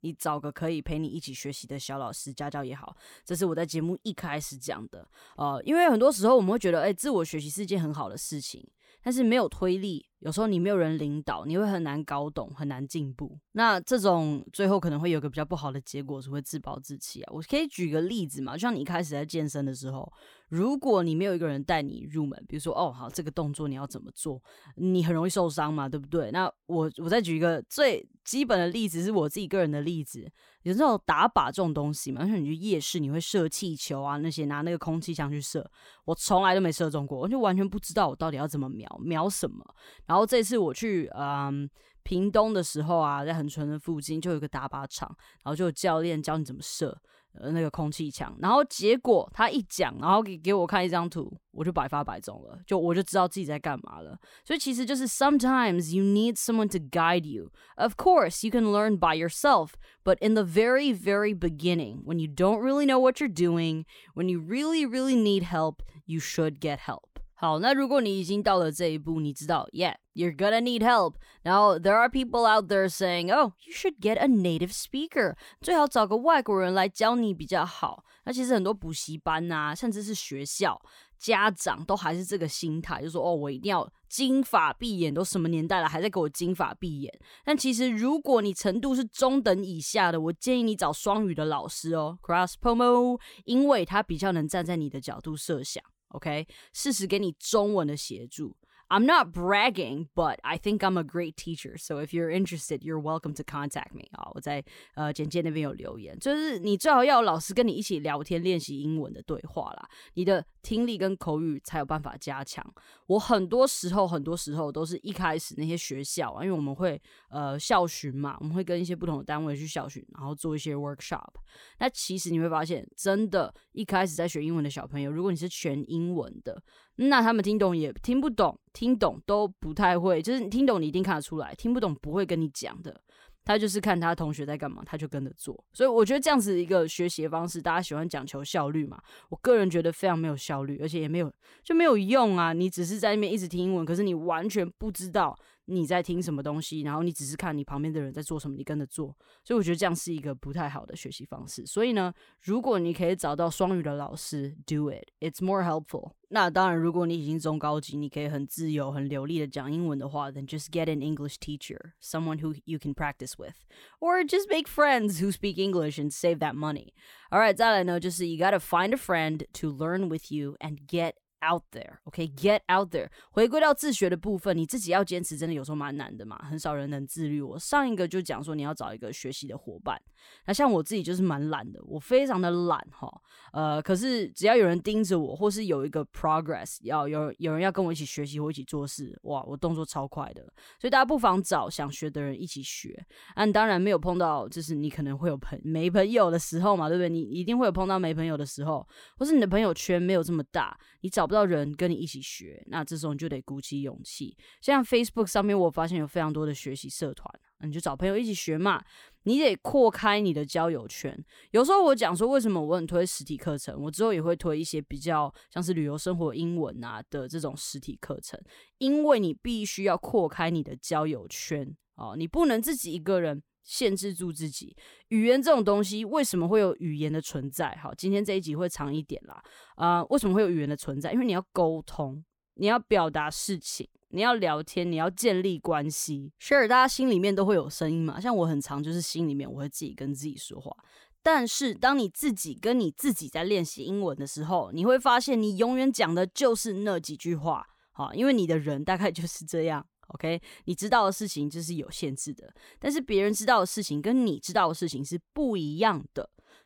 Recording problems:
none

